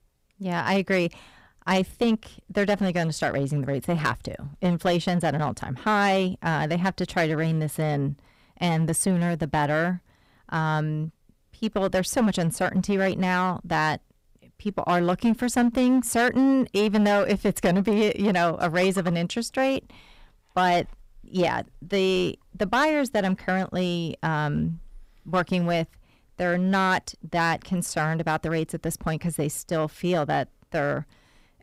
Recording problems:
distortion; slight; 6% of the sound clipped

